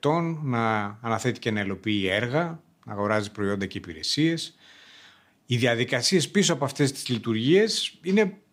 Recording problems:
none

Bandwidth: 15.5 kHz